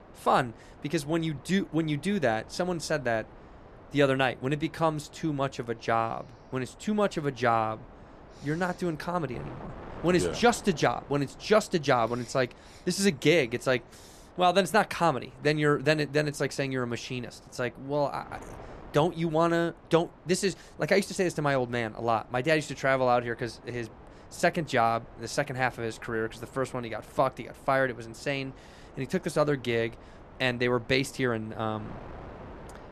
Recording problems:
wind noise on the microphone; occasional gusts; 20 dB below the speech

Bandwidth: 13.5 kHz